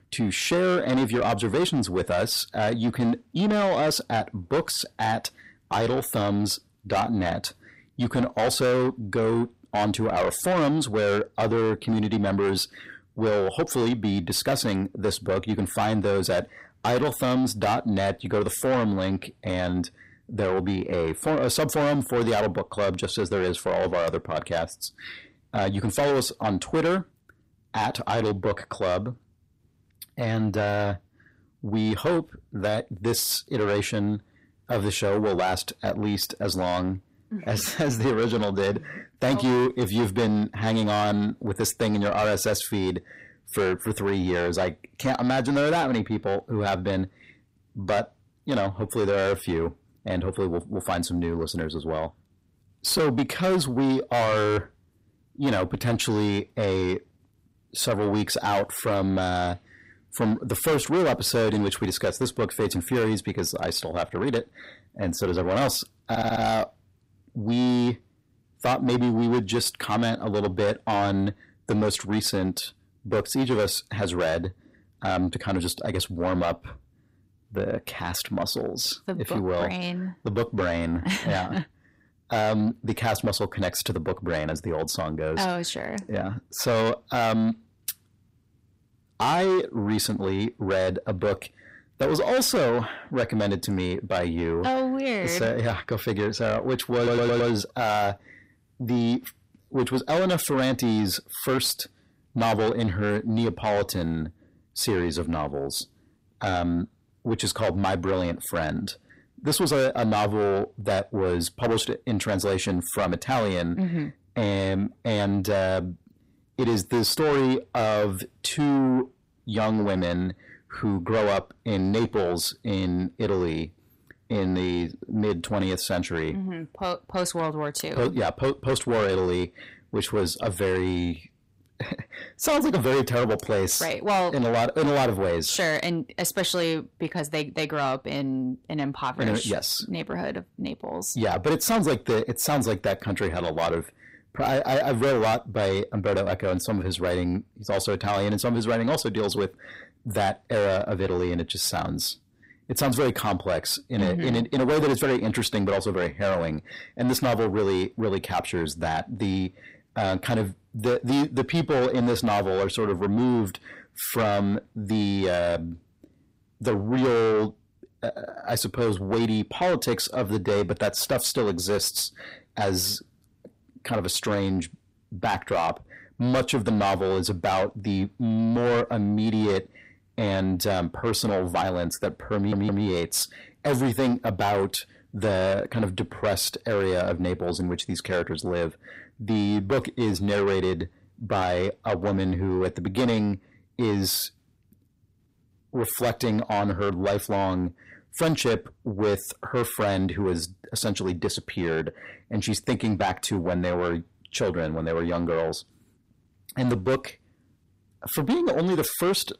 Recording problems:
distortion; heavy; 6 dB below the speech
audio stuttering; at 1:06, at 1:37 and at 3:02

